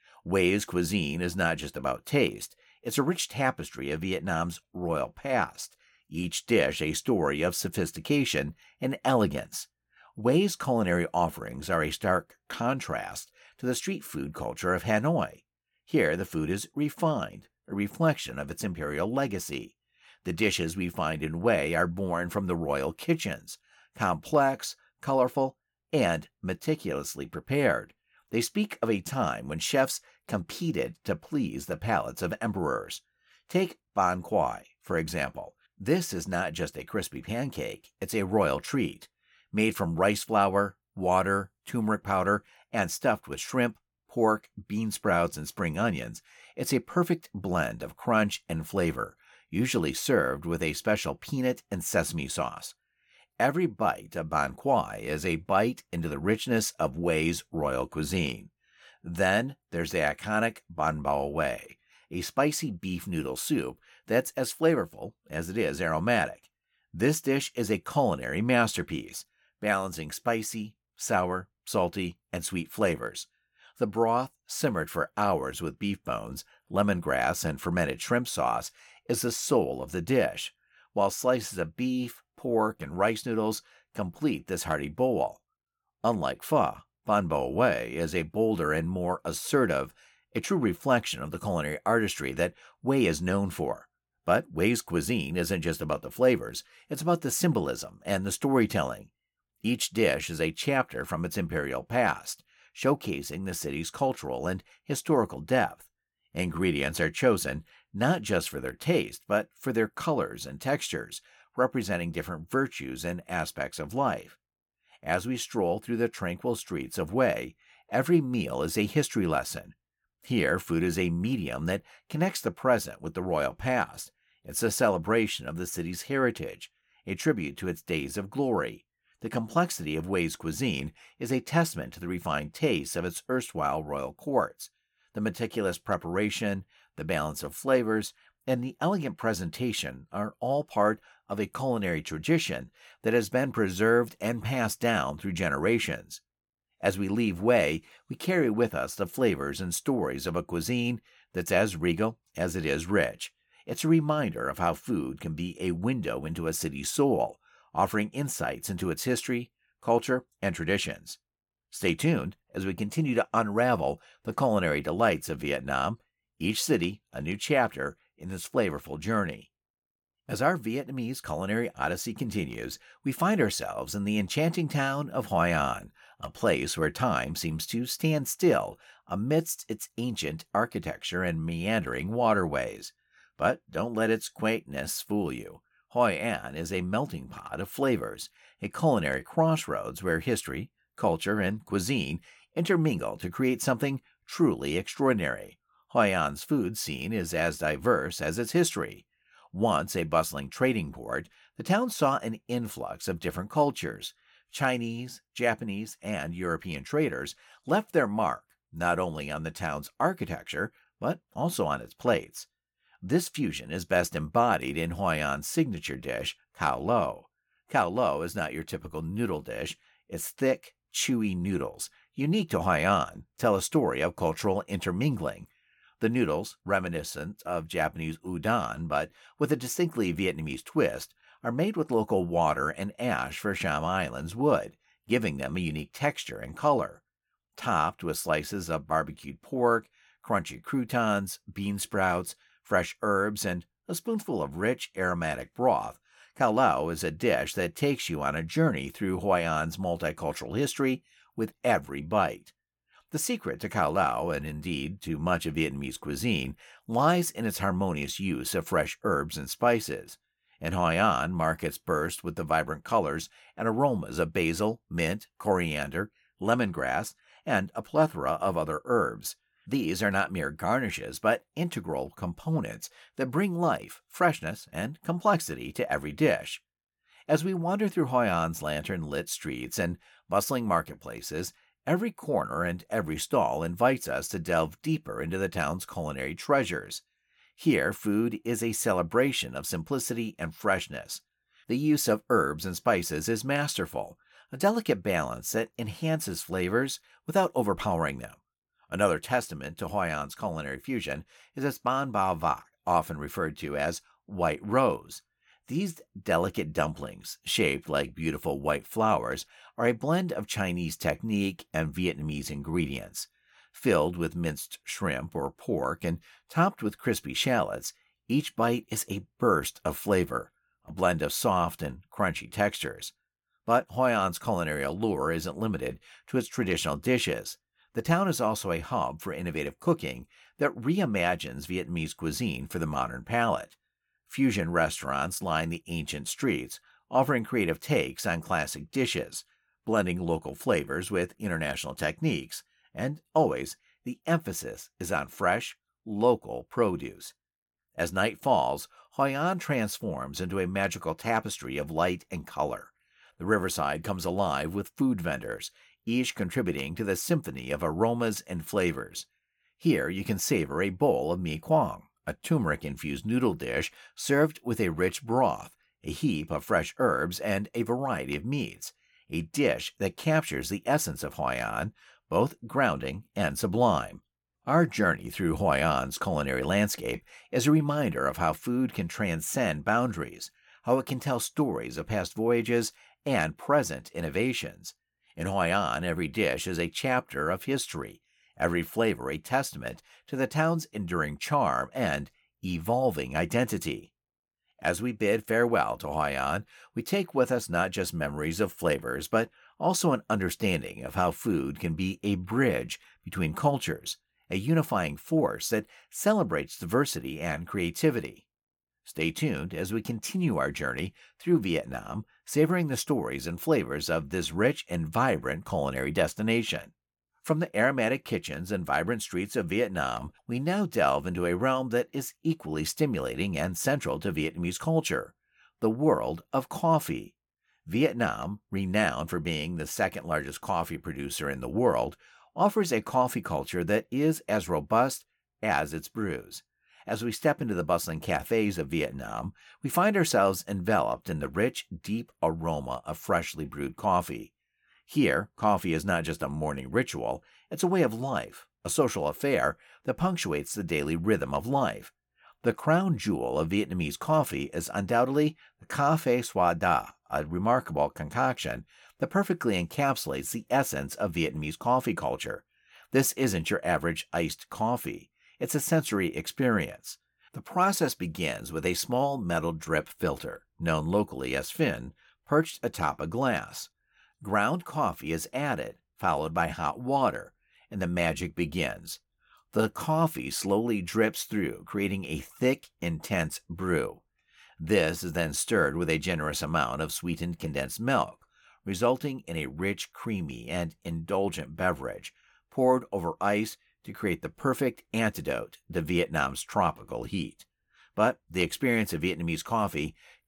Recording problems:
none

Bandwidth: 17.5 kHz